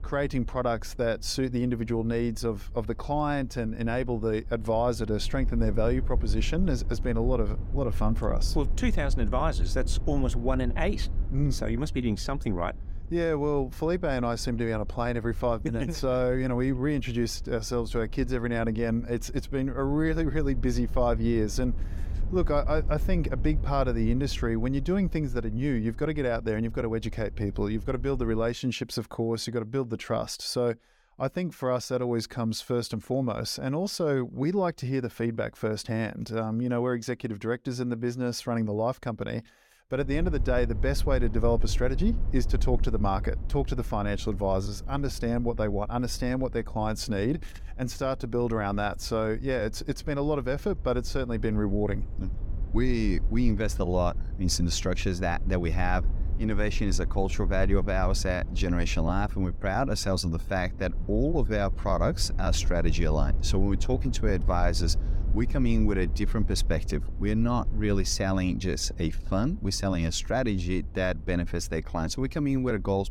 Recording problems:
low rumble; faint; until 28 s and from 40 s on; 20 dB below the speech

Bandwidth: 17.5 kHz